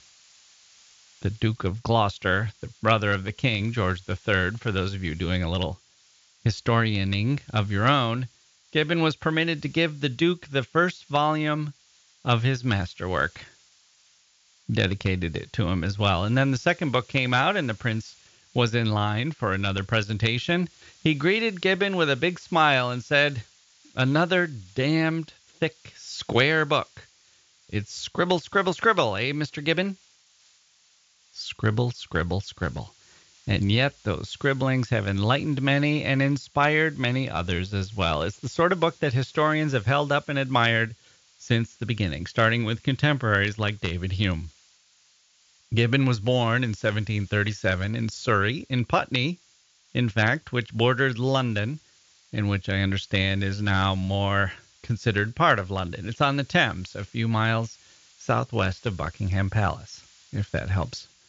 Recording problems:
high frequencies cut off; noticeable; nothing above 7 kHz
hiss; faint; throughout; 30 dB below the speech

